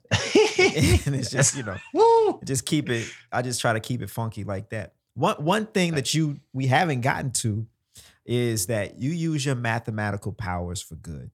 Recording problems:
none

